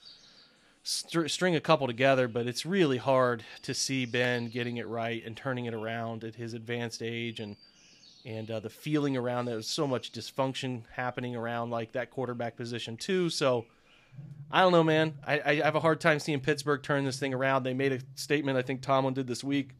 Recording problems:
animal sounds; faint; throughout; 25 dB below the speech

